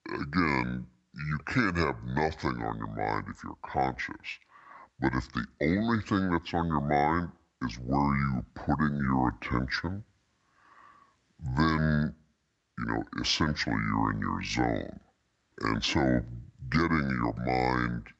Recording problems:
wrong speed and pitch; too slow and too low; 0.7 times normal speed

